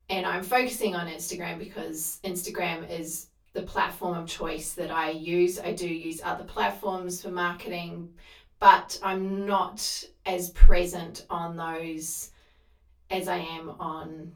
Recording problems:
off-mic speech; far
room echo; very slight; dies away in 0.2 s

